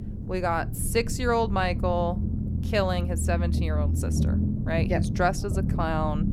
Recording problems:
low rumble; noticeable; throughout; 10 dB below the speech

